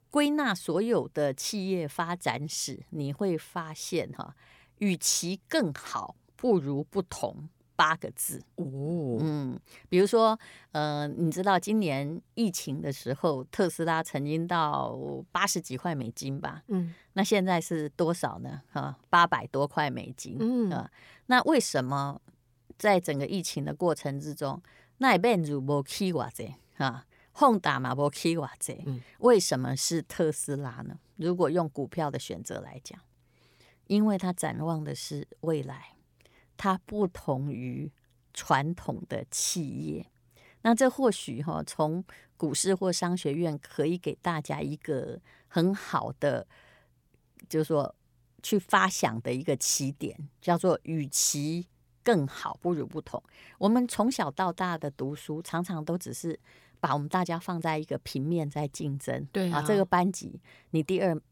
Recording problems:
uneven, jittery; slightly; from 13 to 57 s

